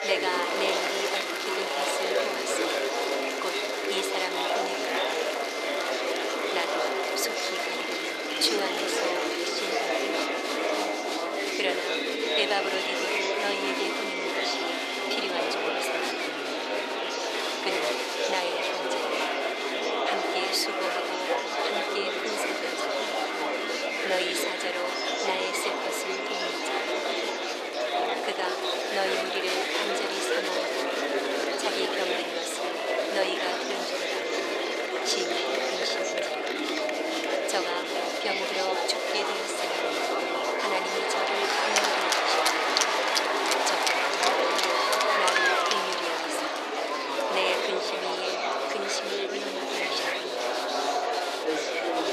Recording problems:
thin; very; fading below 400 Hz
murmuring crowd; very loud; throughout; 6 dB above the speech
high-pitched whine; loud; until 15 s, from 19 to 27 s and from 34 to 46 s; 2 kHz, 5 dB below the speech

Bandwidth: 13.5 kHz